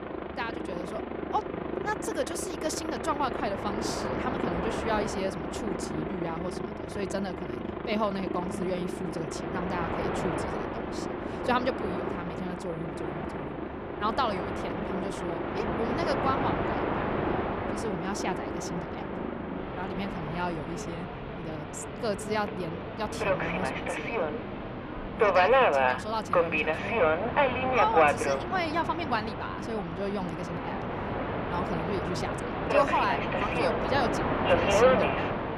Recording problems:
train or aircraft noise; very loud; throughout; 4 dB above the speech

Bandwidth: 15 kHz